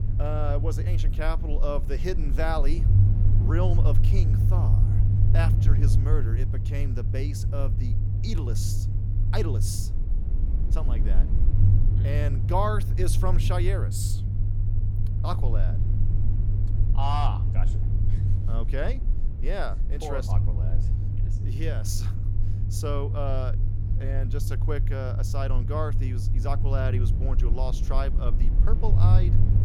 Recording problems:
low rumble; loud; throughout; 6 dB below the speech

